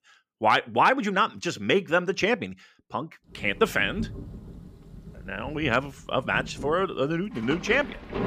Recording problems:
rain or running water; noticeable; from 3.5 s on; 15 dB below the speech

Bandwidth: 15 kHz